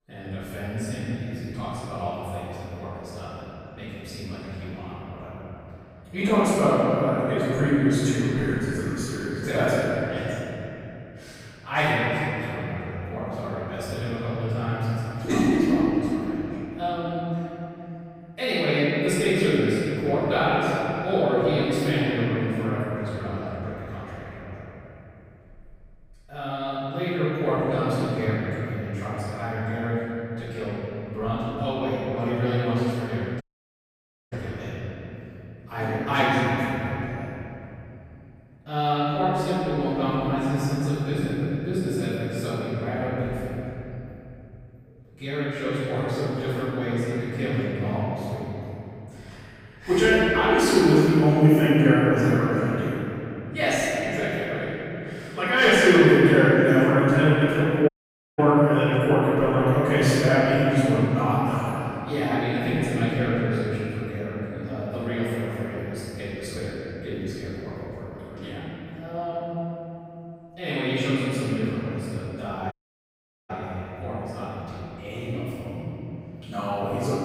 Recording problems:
room echo; strong; dies away in 3 s
off-mic speech; far
echo of what is said; faint; throughout; 430 ms later, 20 dB below the speech
audio cutting out; at 33 s for 1 s, at 58 s and at 1:13 for 1 s

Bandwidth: 15.5 kHz